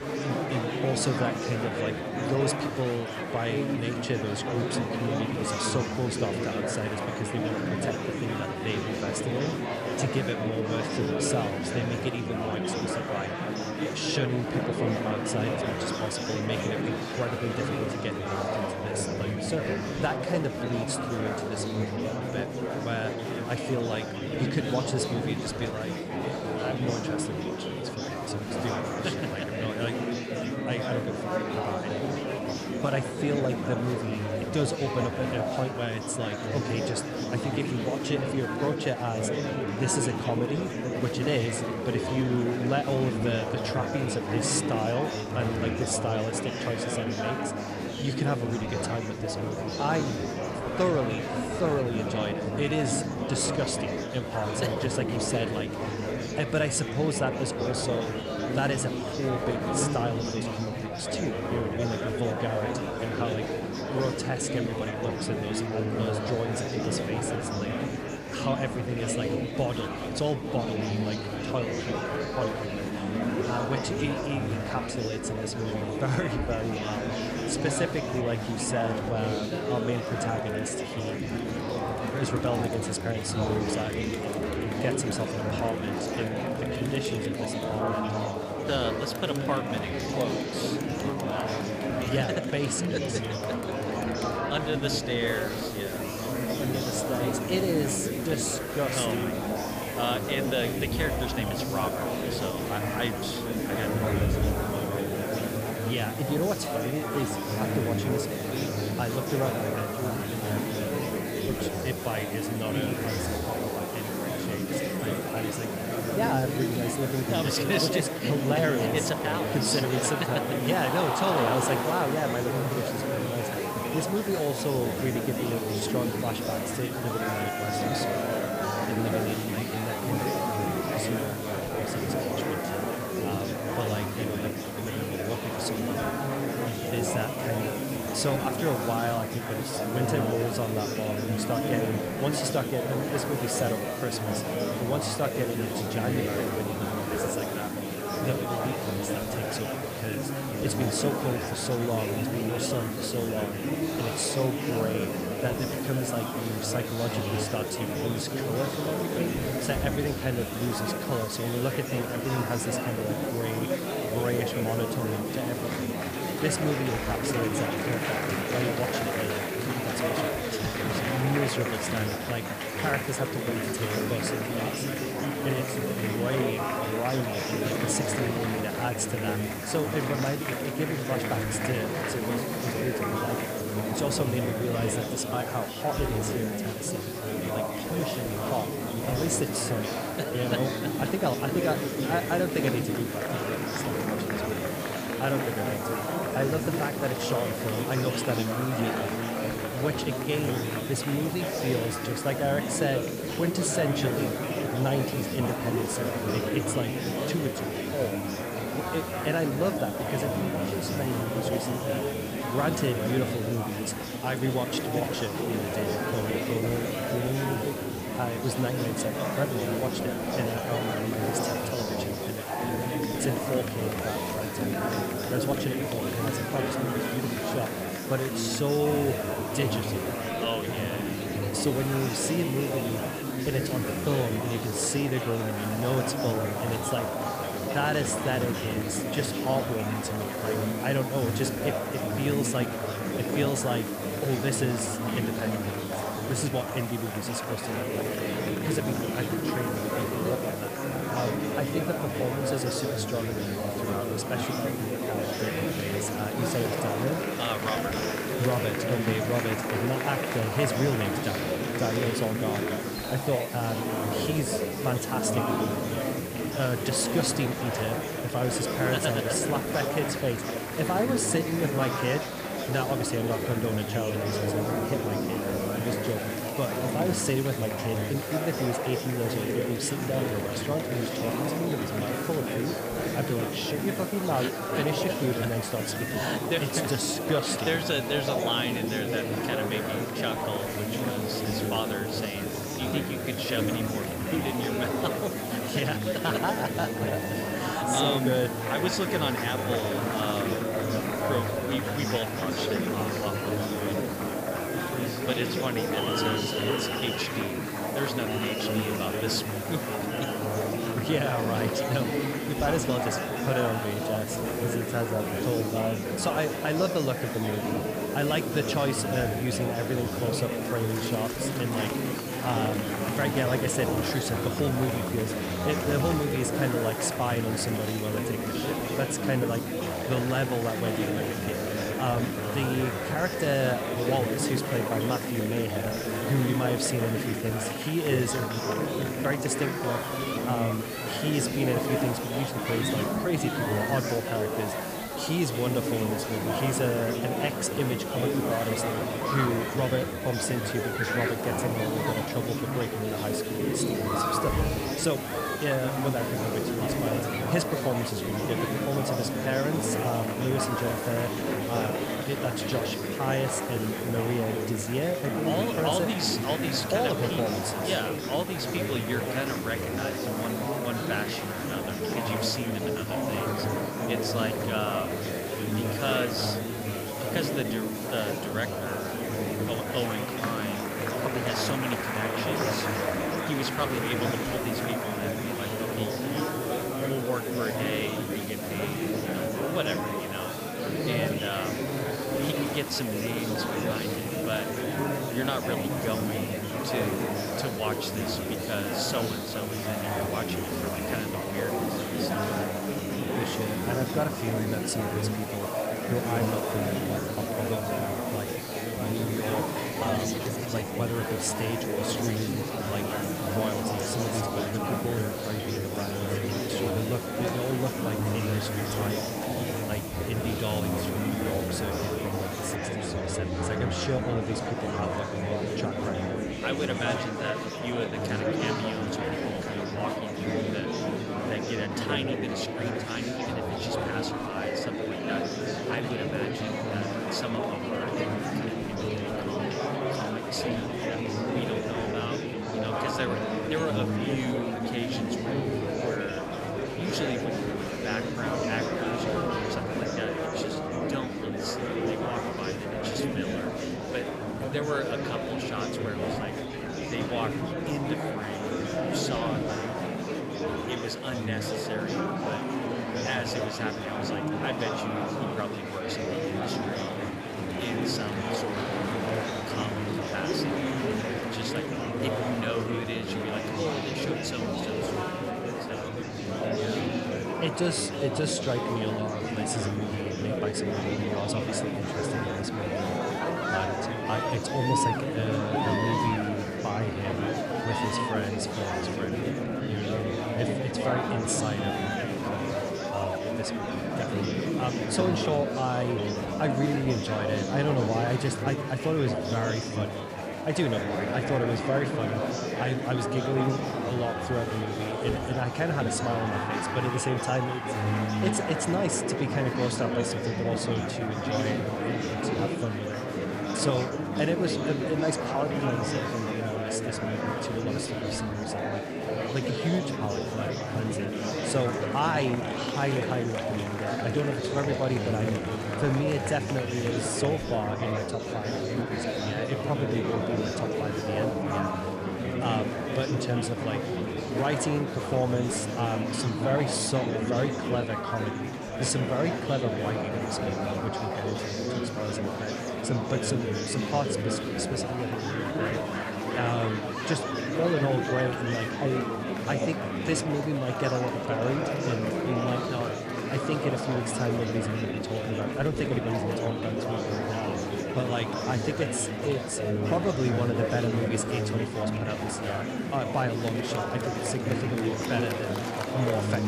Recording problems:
murmuring crowd; very loud; throughout; 1 dB above the speech
hiss; loud; from 1:35 to 7:03; 10 dB below the speech

